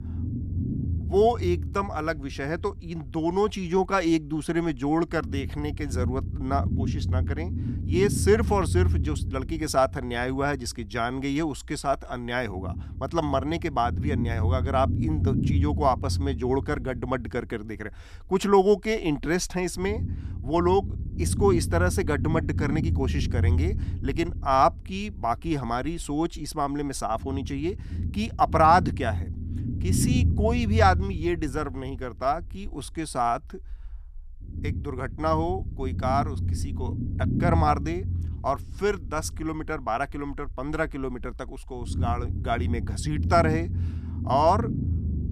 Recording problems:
low rumble; noticeable; throughout; 15 dB below the speech

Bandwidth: 14.5 kHz